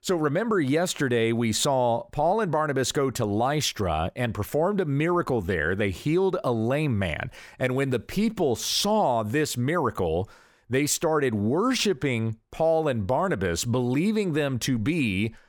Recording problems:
none

